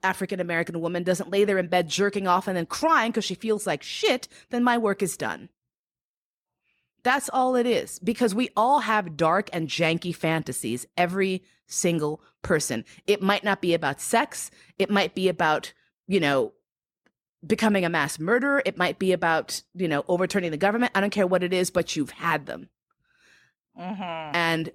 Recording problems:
none

